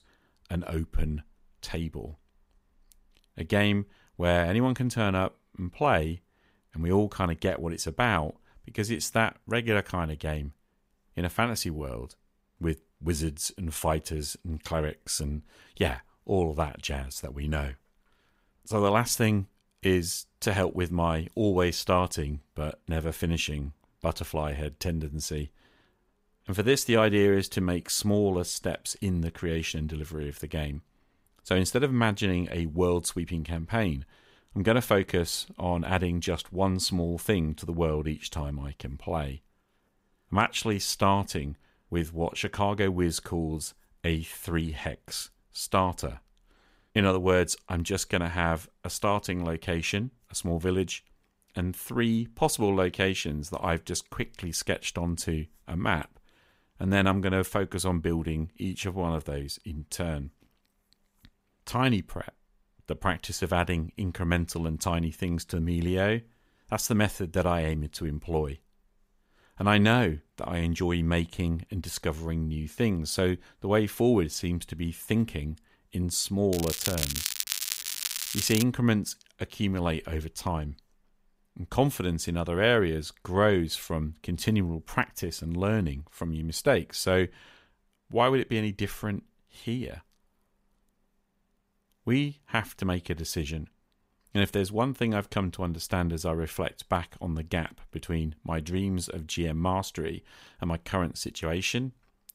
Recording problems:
crackling; loud; from 1:17 to 1:19; 2 dB below the speech

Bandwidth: 15.5 kHz